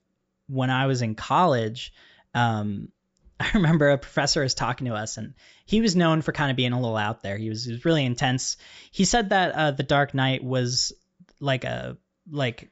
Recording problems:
high frequencies cut off; noticeable; nothing above 8 kHz

